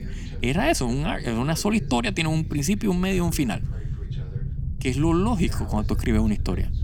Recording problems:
low rumble; noticeable; throughout; 20 dB below the speech
voice in the background; faint; throughout; 20 dB below the speech

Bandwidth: 19 kHz